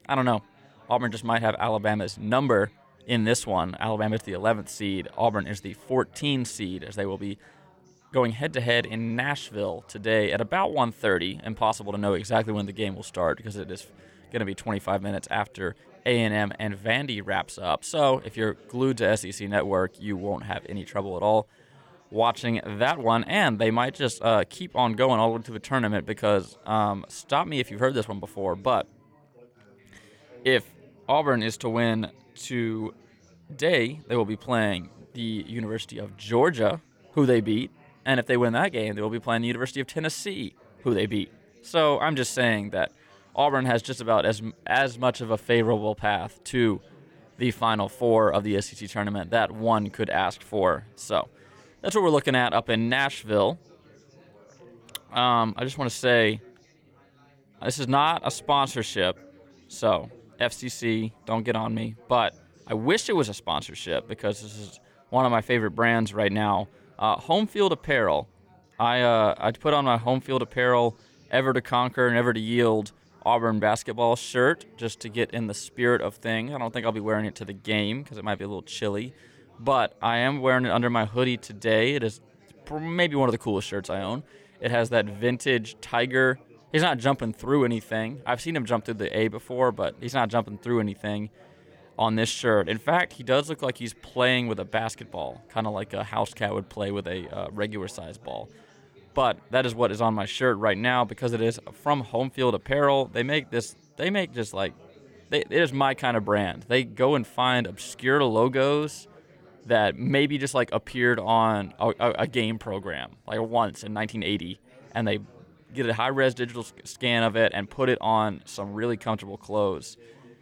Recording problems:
chatter from many people; faint; throughout; 30 dB below the speech

